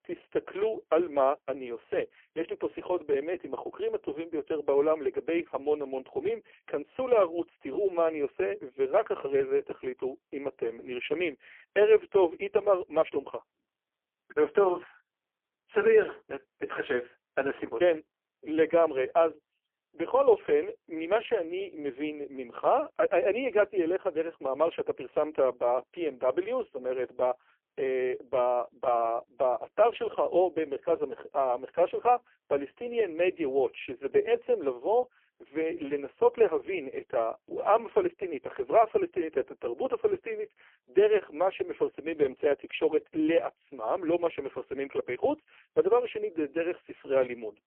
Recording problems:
phone-call audio; poor line; nothing above 3 kHz

